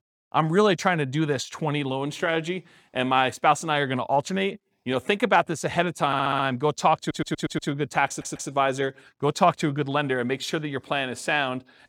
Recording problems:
audio stuttering; at 6 s, at 7 s and at 8 s

